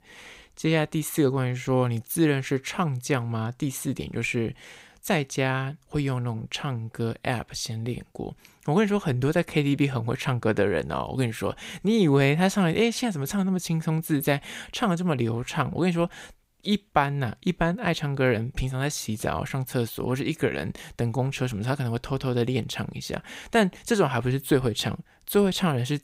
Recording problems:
none

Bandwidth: 15.5 kHz